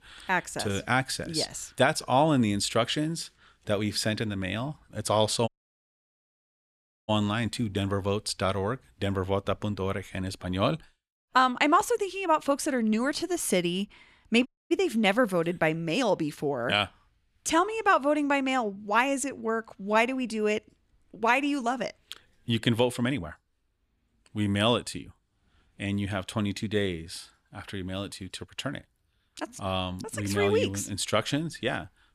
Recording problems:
audio cutting out; at 5.5 s for 1.5 s and at 14 s

